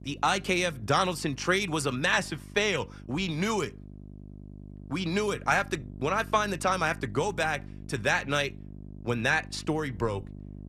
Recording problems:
electrical hum; faint; throughout; 50 Hz, 25 dB below the speech

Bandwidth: 14 kHz